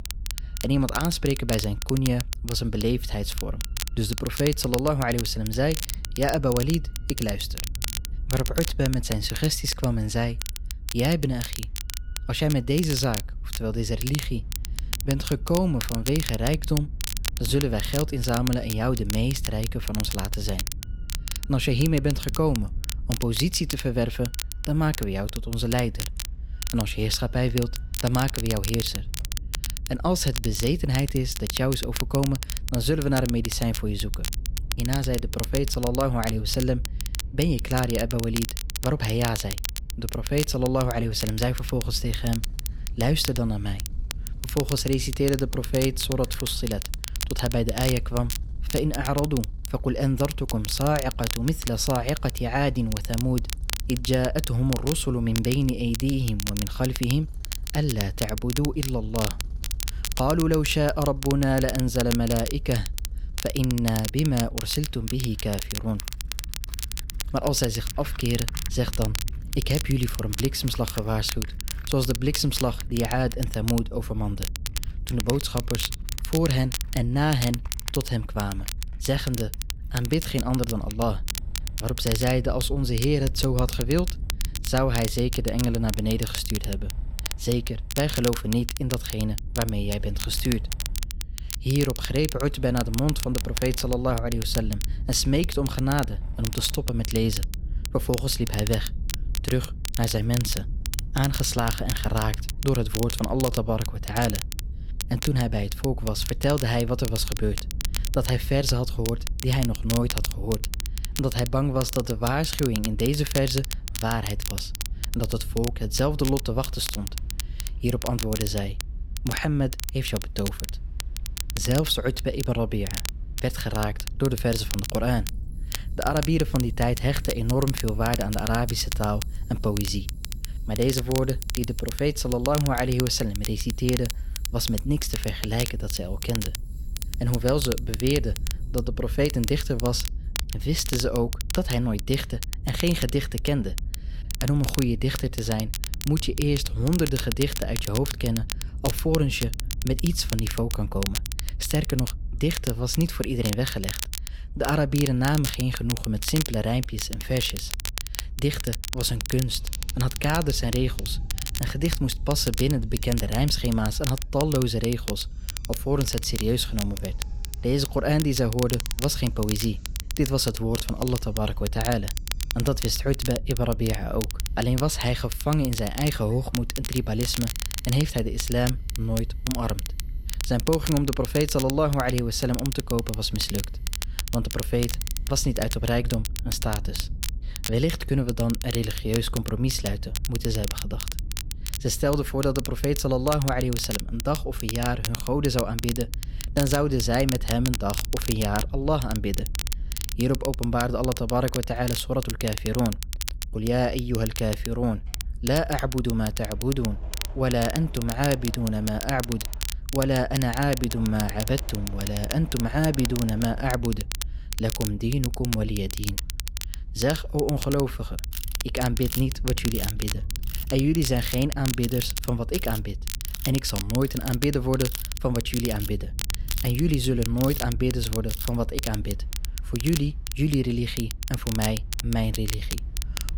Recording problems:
crackle, like an old record; loud; 8 dB below the speech
machinery noise; faint; throughout; 20 dB below the speech
low rumble; faint; throughout; 25 dB below the speech

